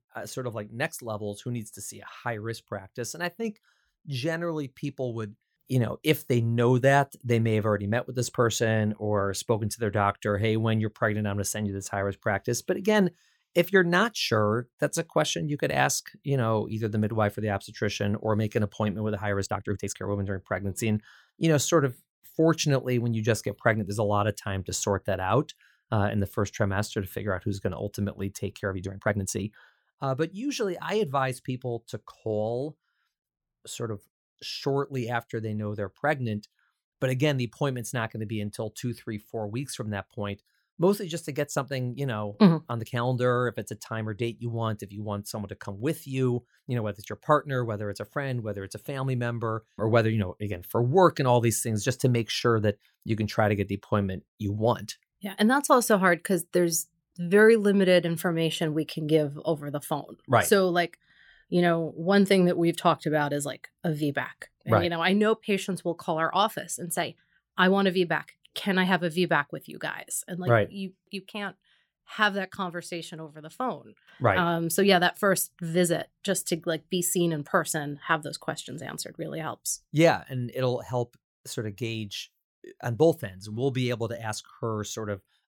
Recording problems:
uneven, jittery; strongly; from 19 to 29 s

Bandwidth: 17 kHz